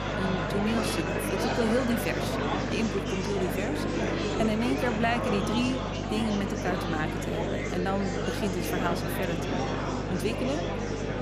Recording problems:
murmuring crowd; very loud; throughout; as loud as the speech
electrical hum; noticeable; throughout; 50 Hz, 10 dB below the speech

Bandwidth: 15 kHz